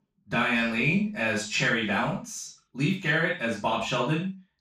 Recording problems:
off-mic speech; far
room echo; noticeable; dies away in 0.3 s

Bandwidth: 15 kHz